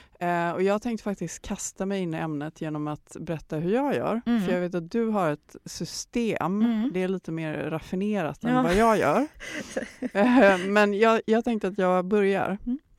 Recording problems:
none

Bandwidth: 16 kHz